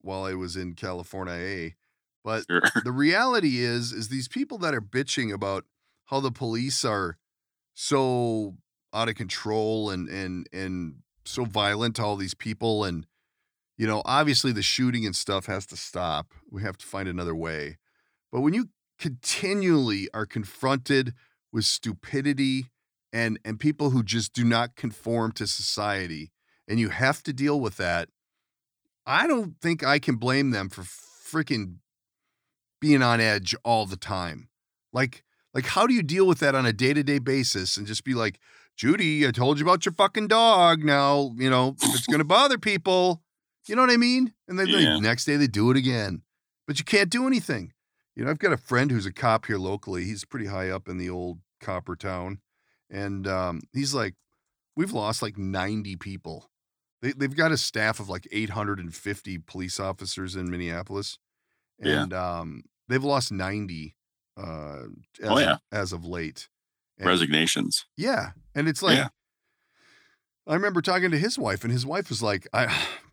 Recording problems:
none

